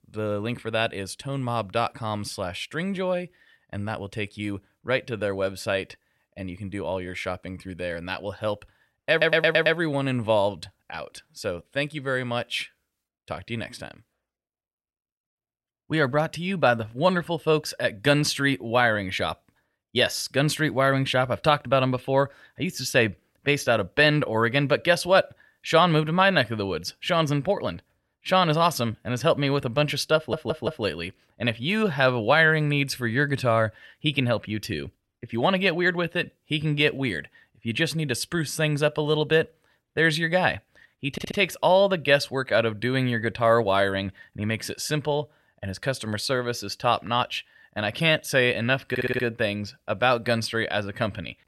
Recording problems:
audio stuttering; 4 times, first at 9 s

